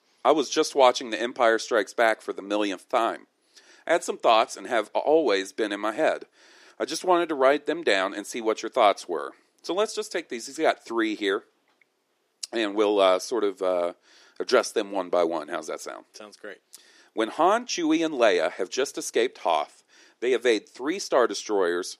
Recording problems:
thin; somewhat; fading below 300 Hz

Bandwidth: 14.5 kHz